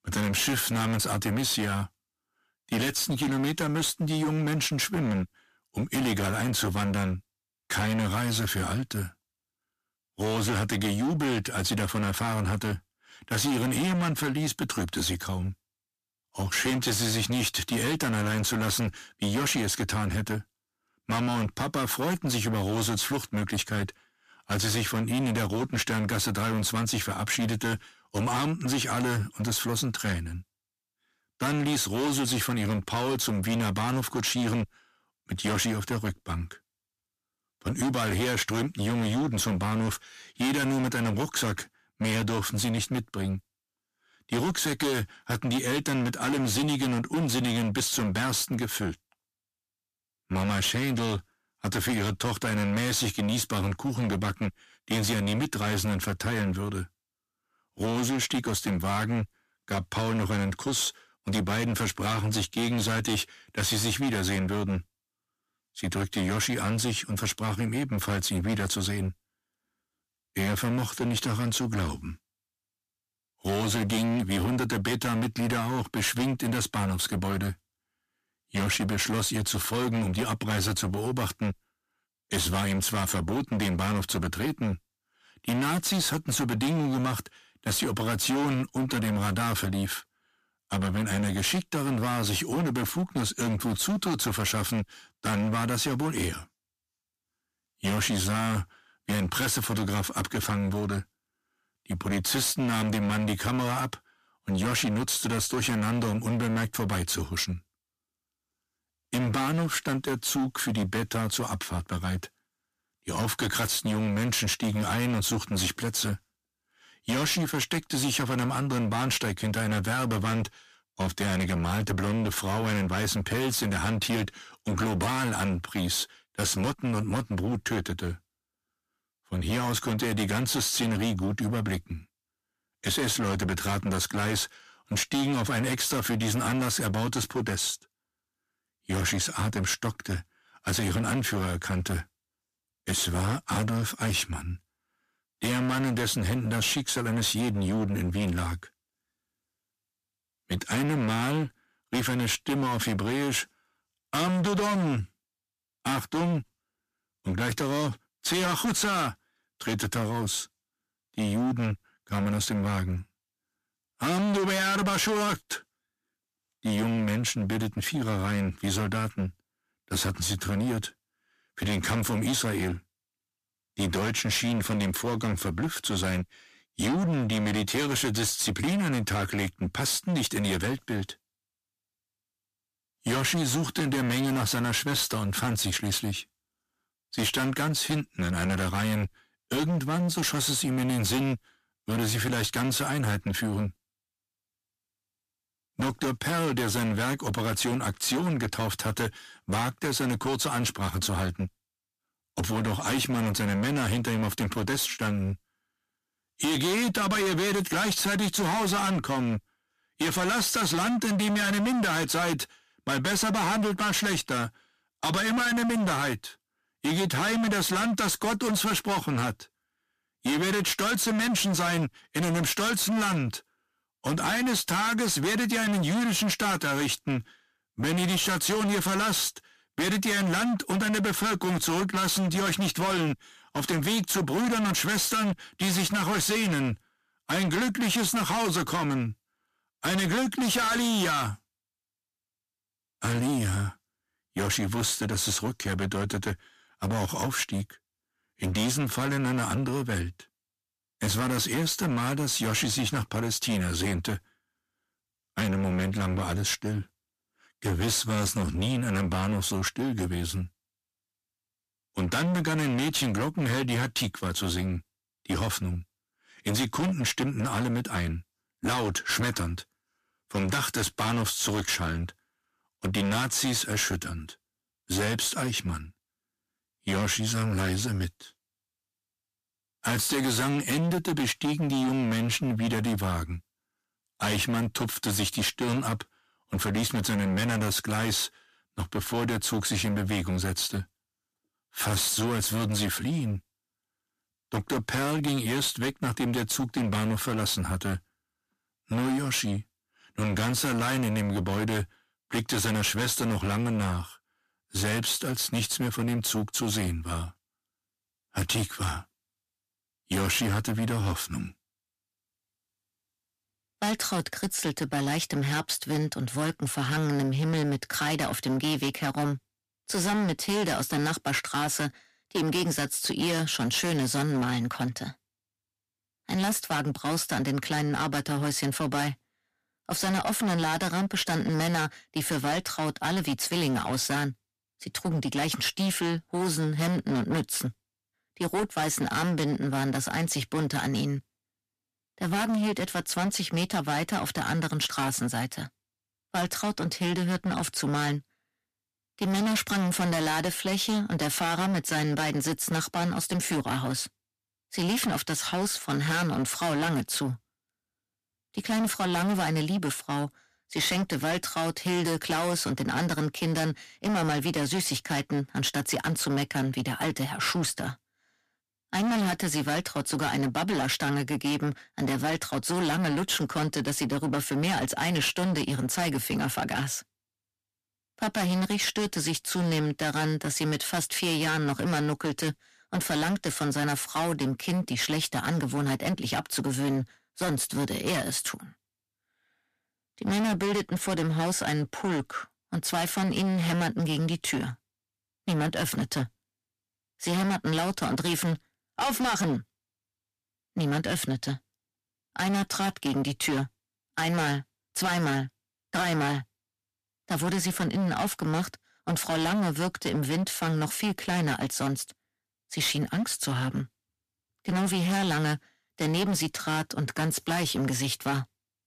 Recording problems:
distortion; heavy; 22% of the sound clipped

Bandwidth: 14.5 kHz